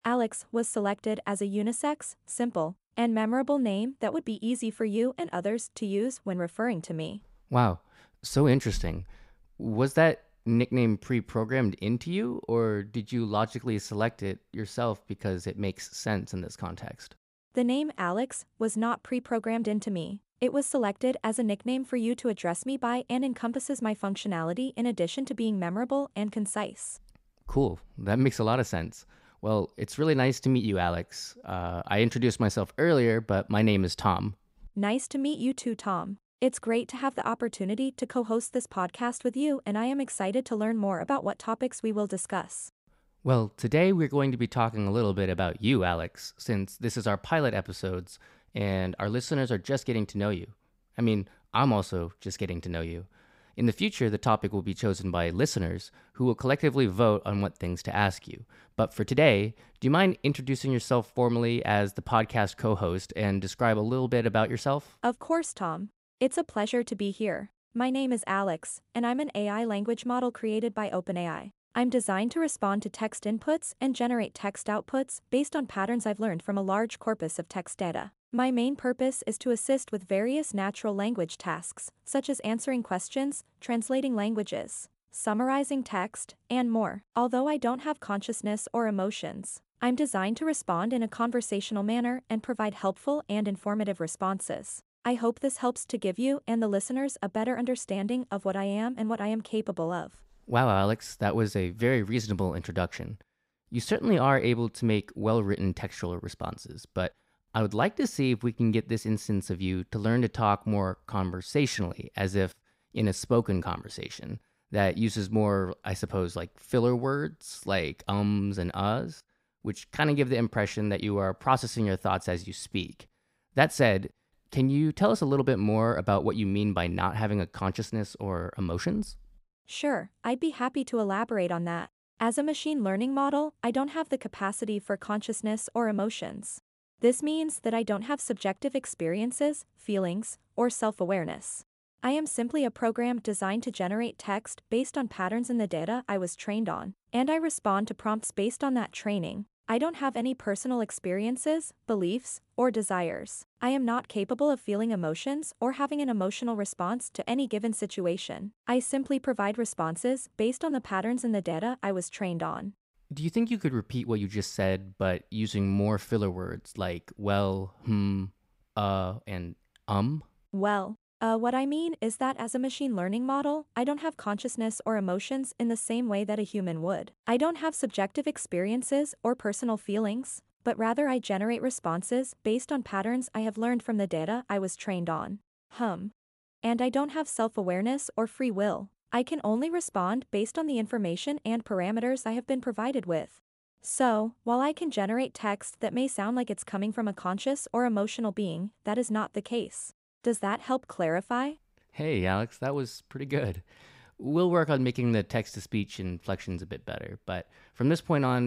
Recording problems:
abrupt cut into speech; at the end

